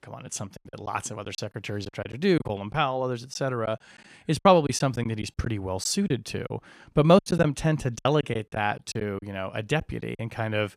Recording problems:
choppy; very; from 0.5 to 2.5 s, from 3.5 to 6.5 s and from 7 to 10 s; 11% of the speech affected

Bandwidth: 14.5 kHz